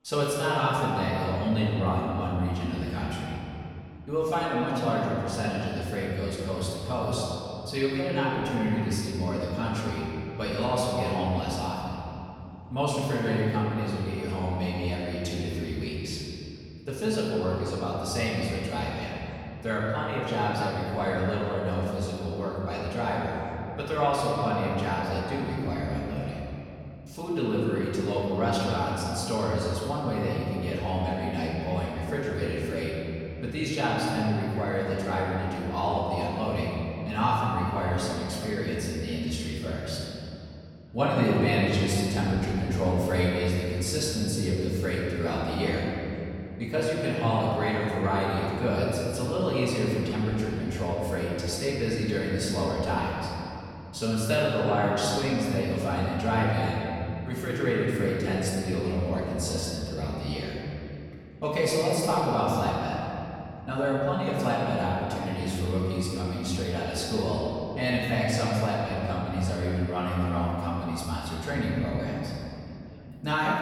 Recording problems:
room echo; strong; dies away in 2.7 s
off-mic speech; far
background chatter; faint; throughout; 4 voices, 30 dB below the speech

